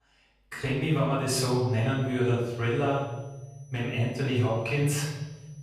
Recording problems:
off-mic speech; far
room echo; noticeable; dies away in 1.2 s
high-pitched whine; faint; from 1.5 s on; 6 kHz, 30 dB below the speech

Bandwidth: 14.5 kHz